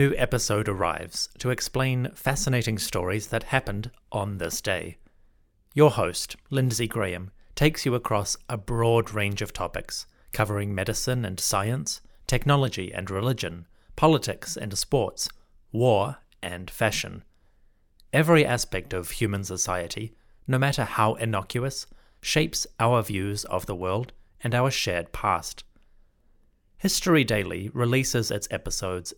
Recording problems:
abrupt cut into speech; at the start

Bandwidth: 18 kHz